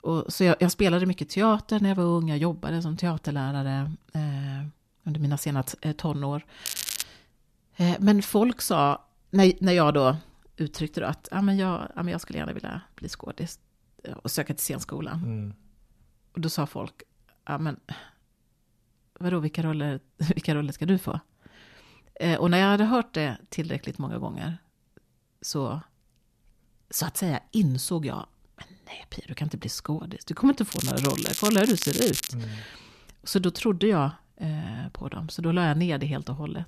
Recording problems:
crackling; loud; at 6.5 s and from 31 to 32 s; 4 dB below the speech

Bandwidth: 14 kHz